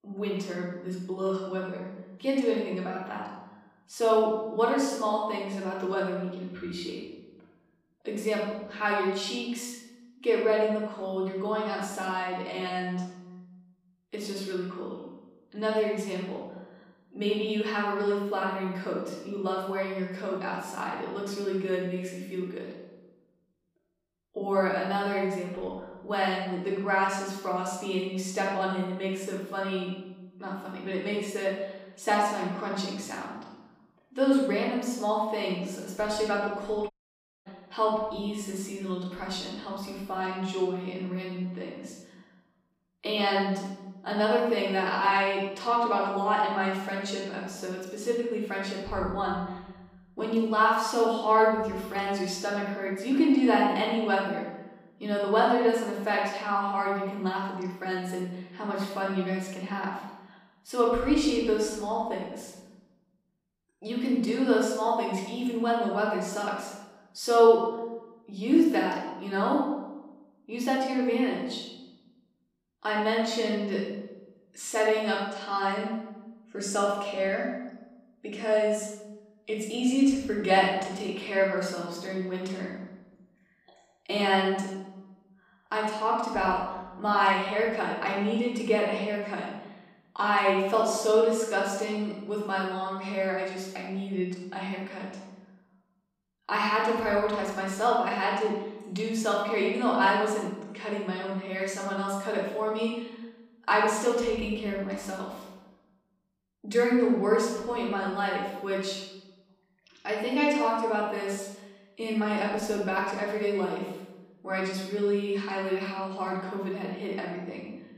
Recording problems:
off-mic speech; far
room echo; noticeable; dies away in 1.1 s
audio cutting out; at 37 s for 0.5 s

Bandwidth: 15 kHz